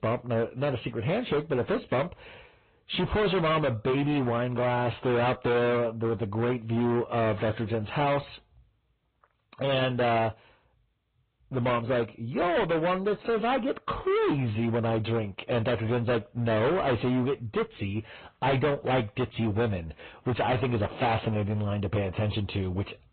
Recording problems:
distortion; heavy; 19% of the sound clipped
high frequencies cut off; severe; nothing above 4 kHz
garbled, watery; slightly

